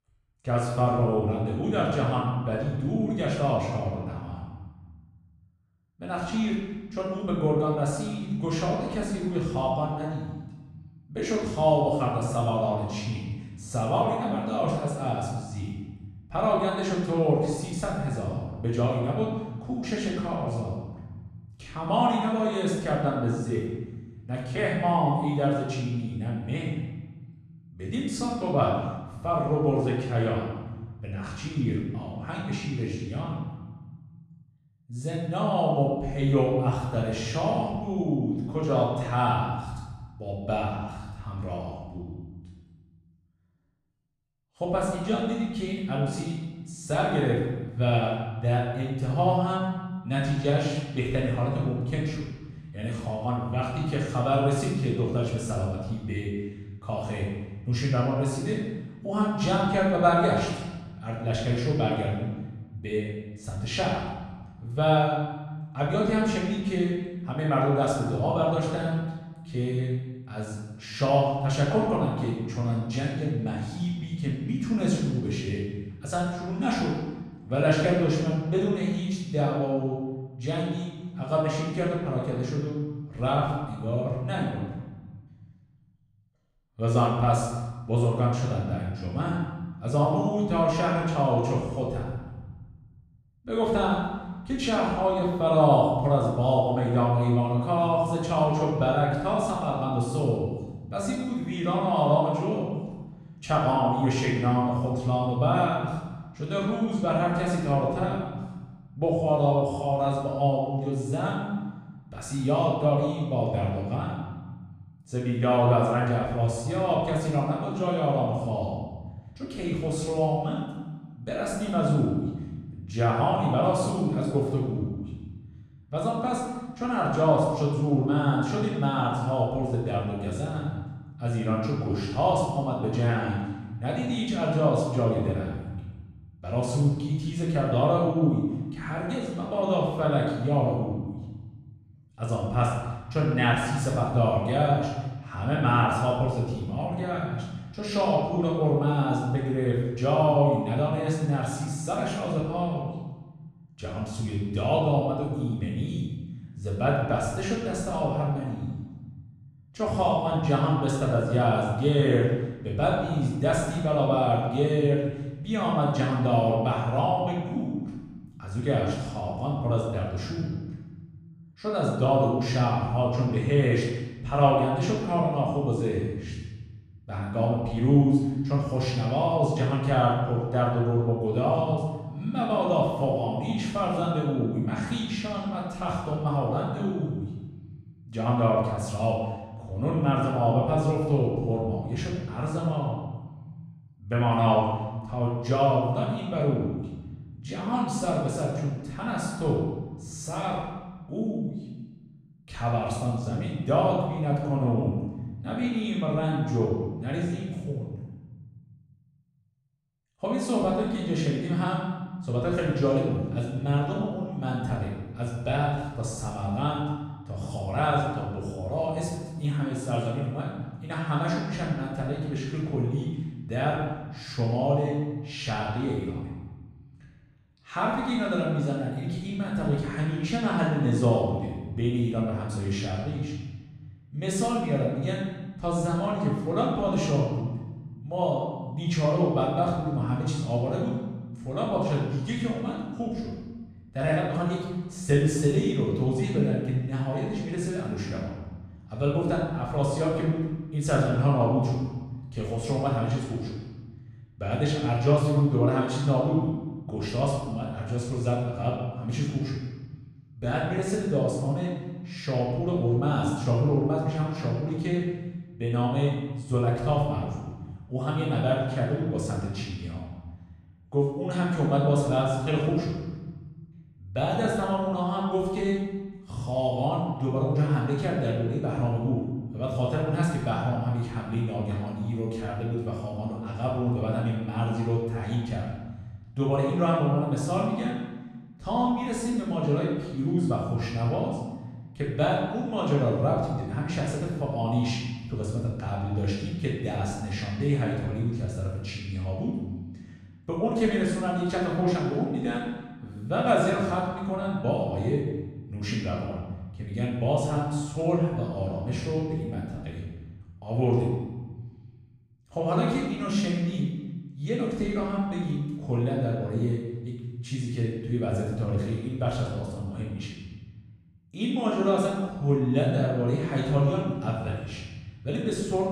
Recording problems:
off-mic speech; far
room echo; noticeable; dies away in 1.1 s

